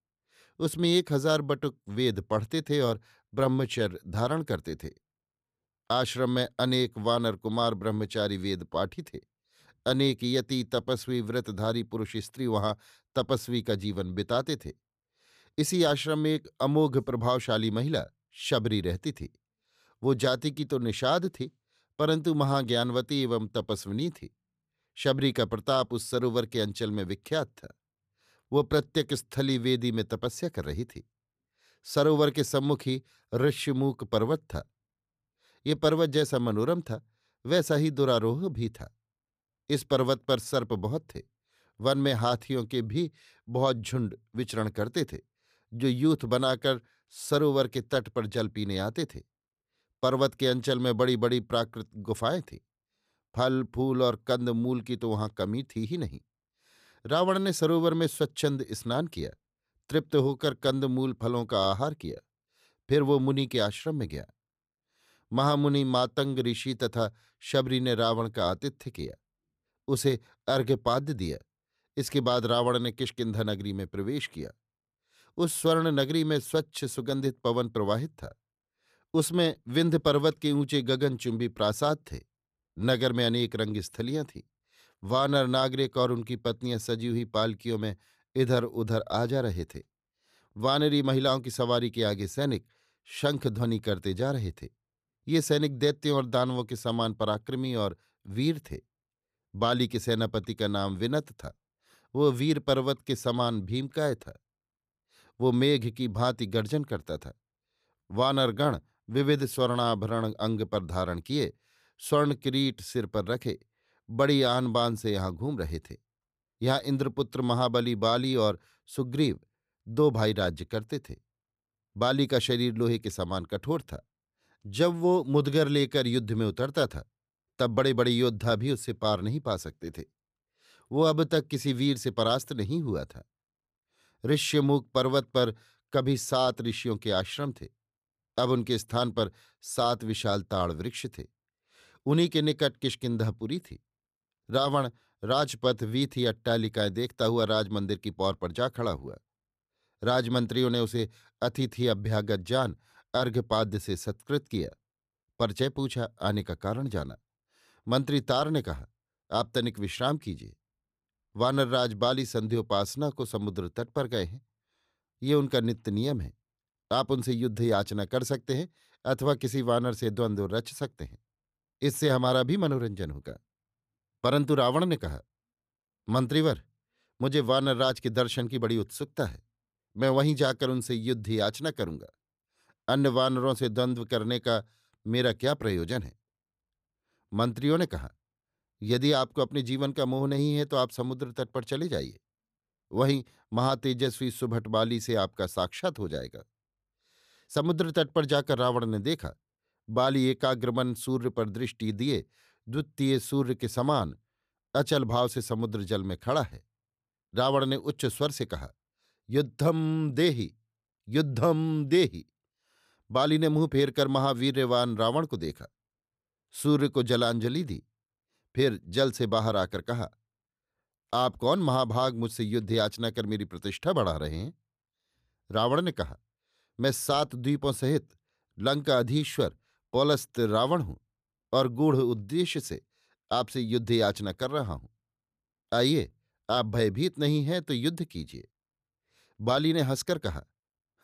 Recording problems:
none

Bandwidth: 14.5 kHz